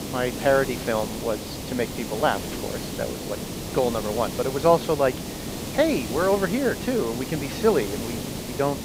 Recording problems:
high frequencies cut off; noticeable; nothing above 6.5 kHz
hiss; loud; throughout; 7 dB below the speech

